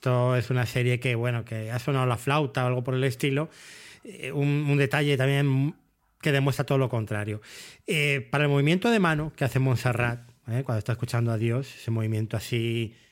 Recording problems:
none

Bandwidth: 16 kHz